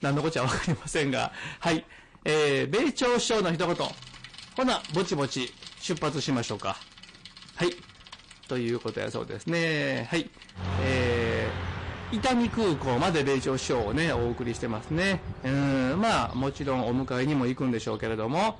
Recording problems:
distortion; heavy; 12% of the sound clipped
garbled, watery; slightly; nothing above 8.5 kHz
traffic noise; noticeable; throughout; 10 dB below the speech

